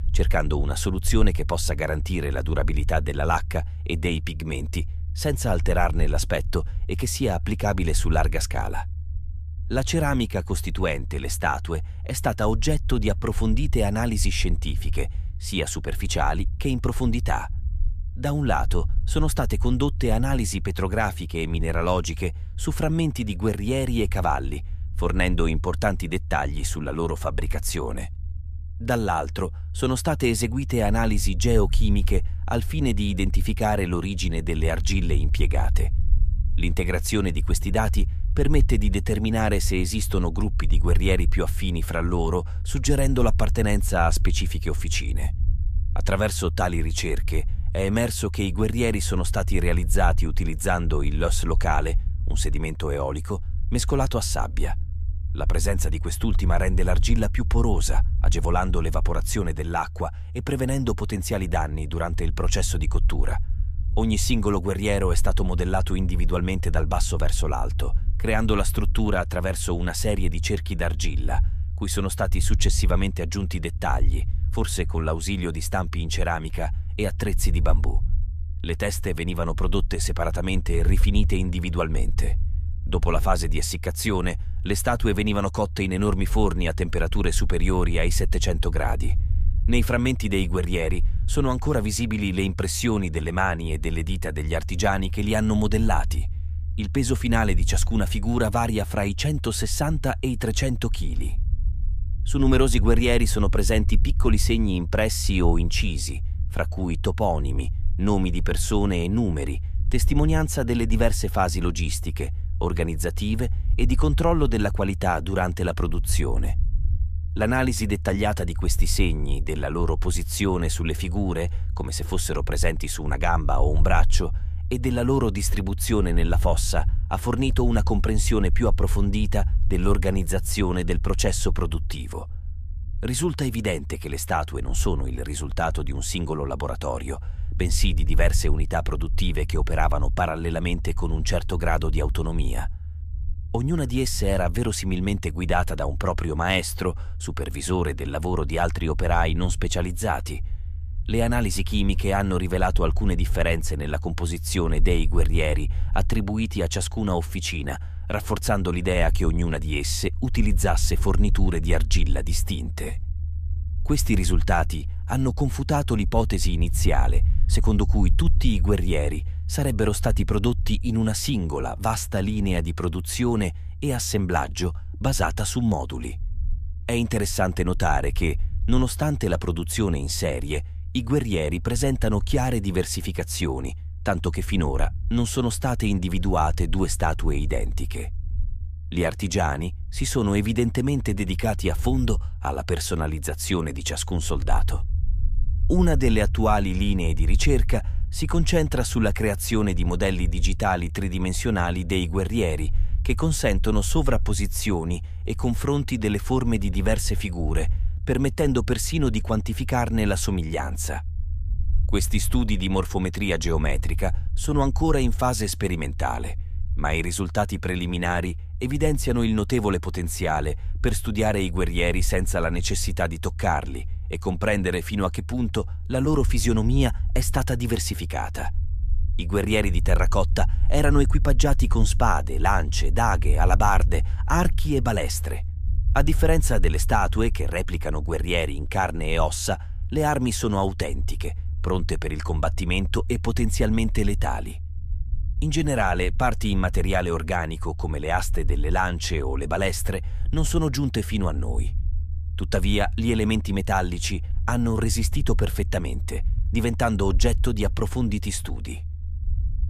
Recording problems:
low rumble; faint; throughout; 20 dB below the speech

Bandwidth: 14.5 kHz